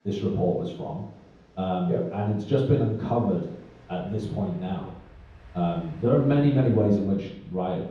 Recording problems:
room echo; strong; dies away in 0.9 s
off-mic speech; far
train or aircraft noise; faint; throughout; 25 dB below the speech

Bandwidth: 14 kHz